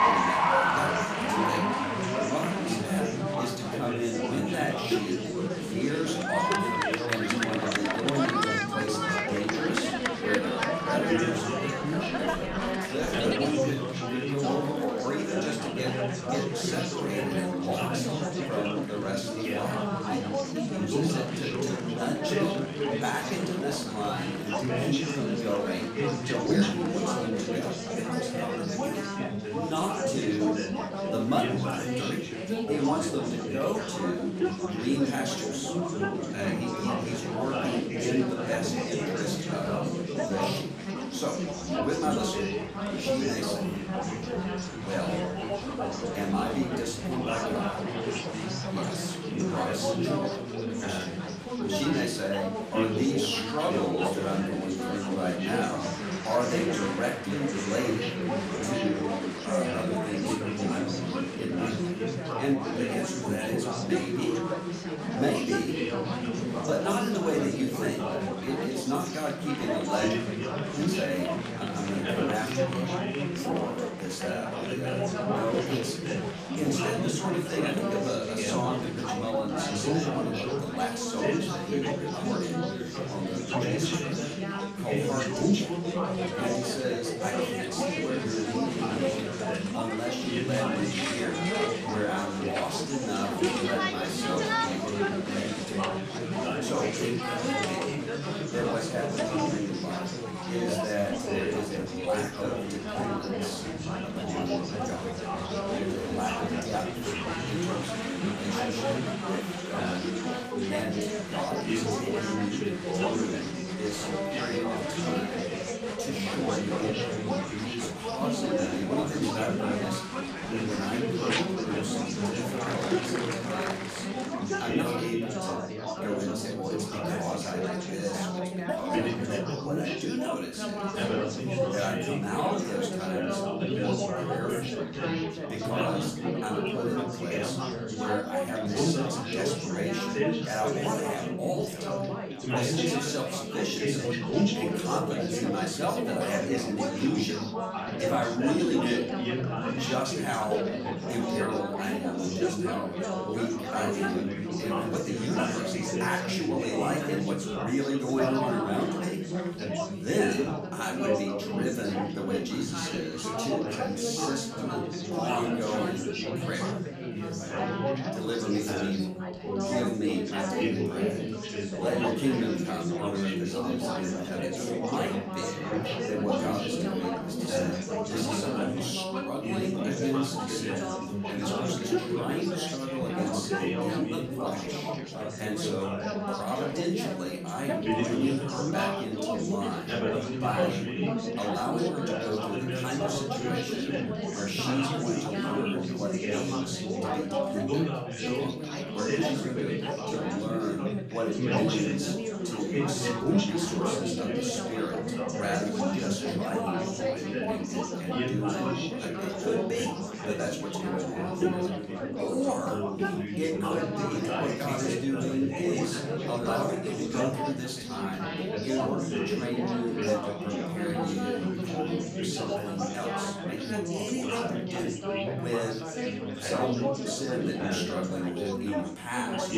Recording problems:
off-mic speech; far
room echo; slight; dies away in 0.5 s
chatter from many people; very loud; throughout; 2 dB above the speech

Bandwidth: 14.5 kHz